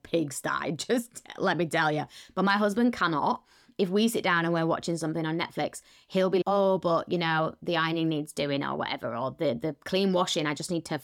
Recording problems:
none

